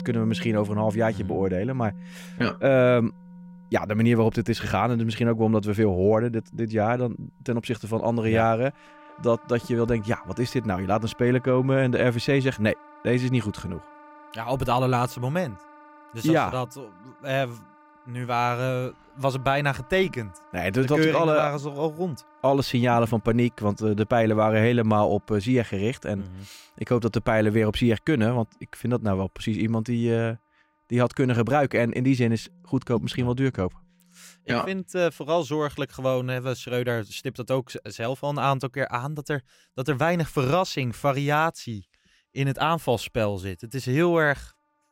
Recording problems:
background music; faint; throughout; 20 dB below the speech

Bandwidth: 16 kHz